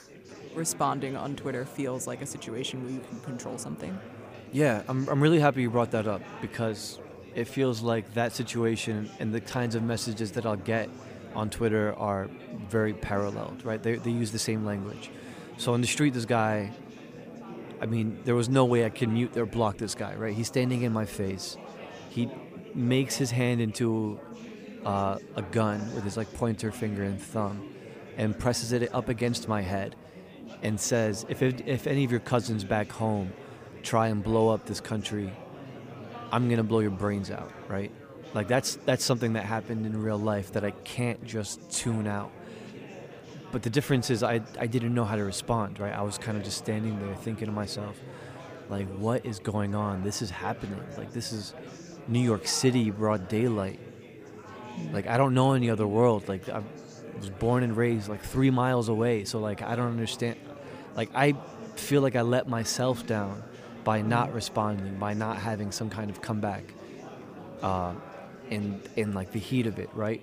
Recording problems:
chatter from many people; noticeable; throughout; 15 dB below the speech

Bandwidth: 15 kHz